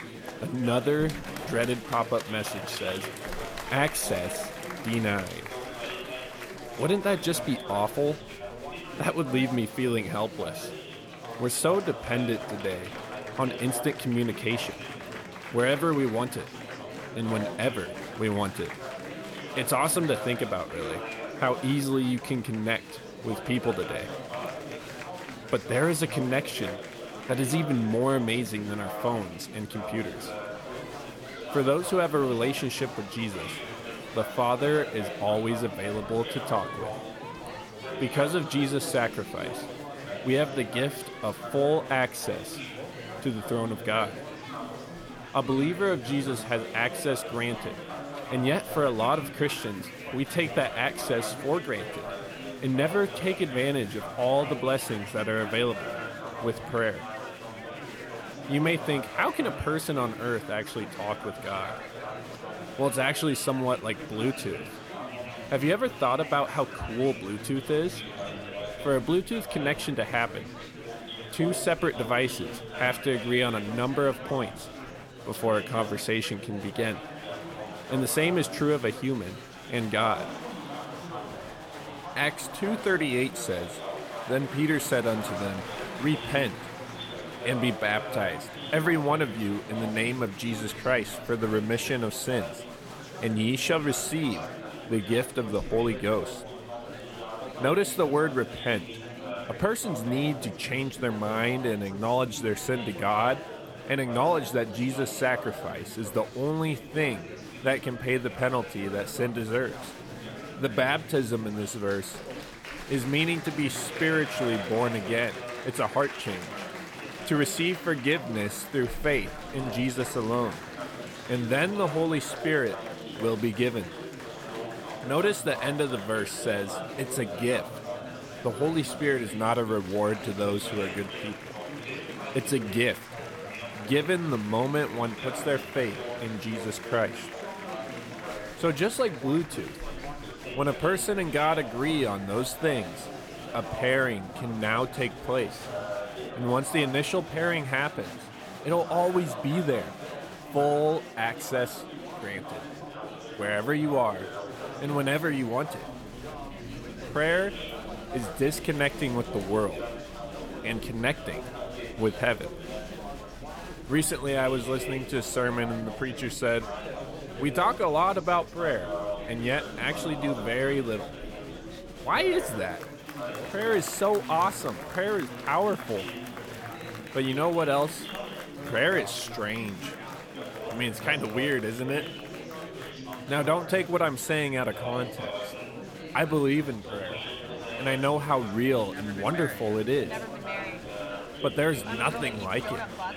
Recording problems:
chatter from many people; loud; throughout; 9 dB below the speech

